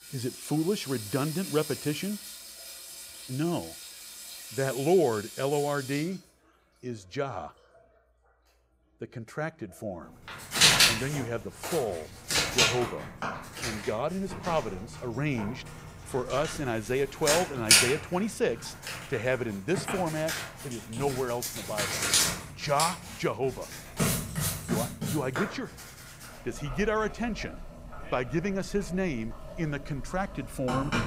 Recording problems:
household noises; very loud; throughout; 3 dB above the speech

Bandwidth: 15.5 kHz